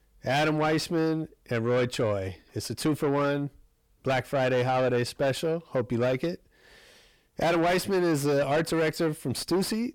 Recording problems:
distortion; heavy; 6 dB below the speech

